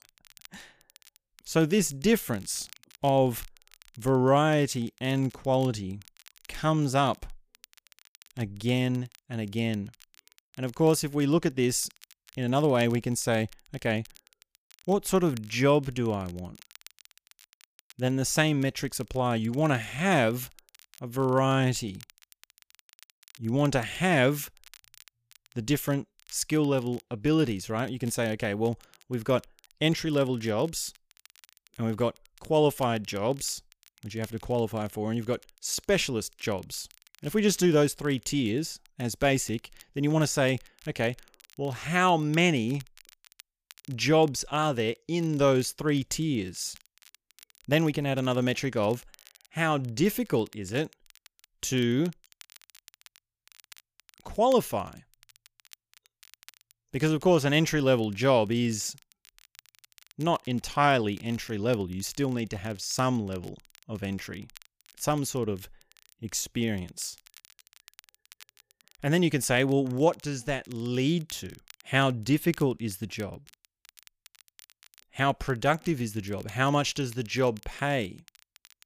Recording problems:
crackle, like an old record; faint; 25 dB below the speech

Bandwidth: 15 kHz